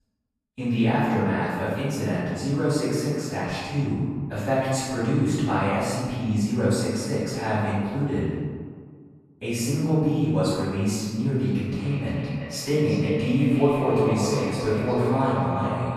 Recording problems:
echo of what is said; strong; from 12 s on; 350 ms later, 8 dB below the speech
room echo; strong; dies away in 1.6 s
off-mic speech; far

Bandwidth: 14 kHz